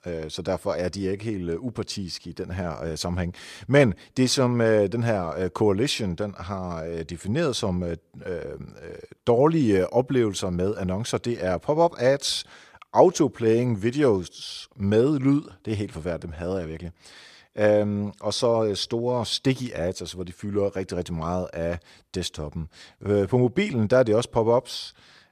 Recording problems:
none

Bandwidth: 14.5 kHz